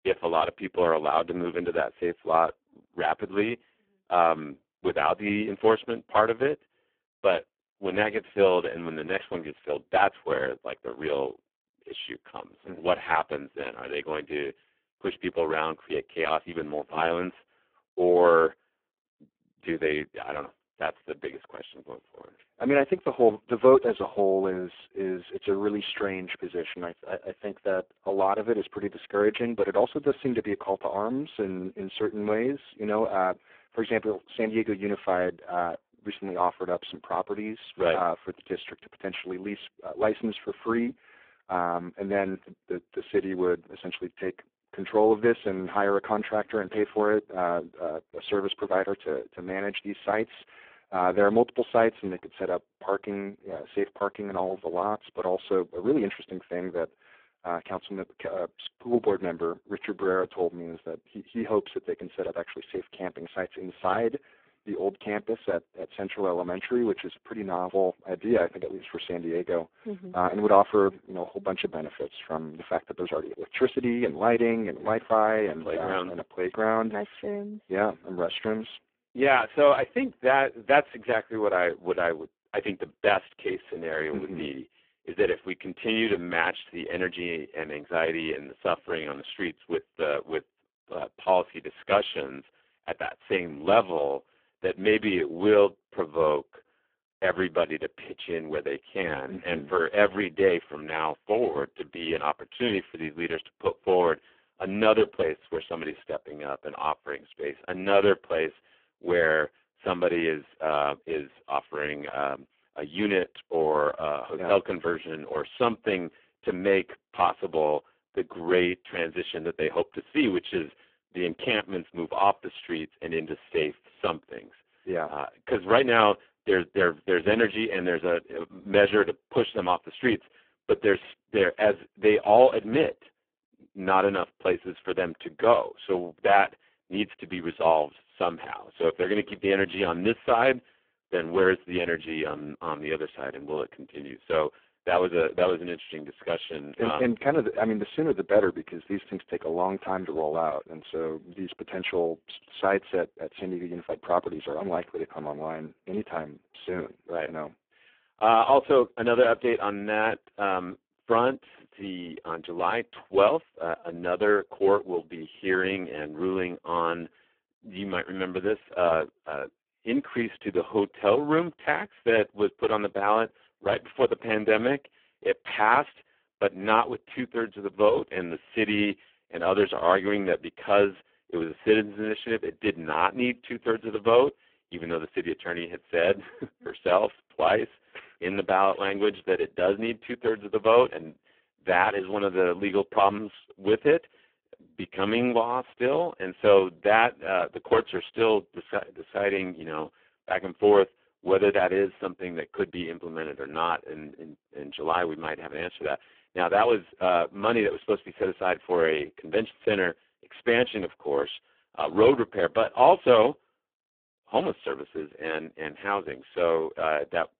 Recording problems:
phone-call audio; poor line

